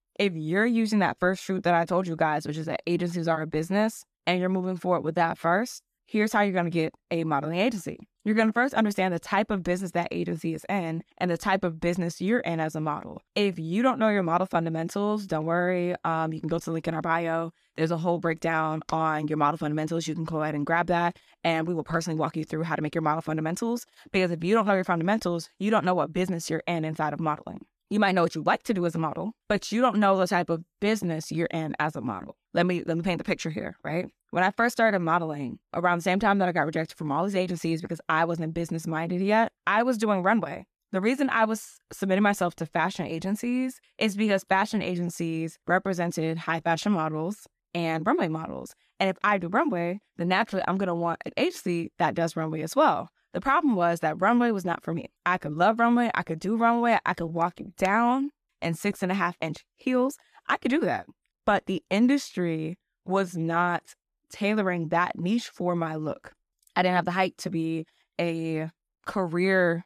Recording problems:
none

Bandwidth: 14.5 kHz